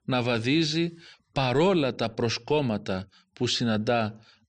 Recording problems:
none

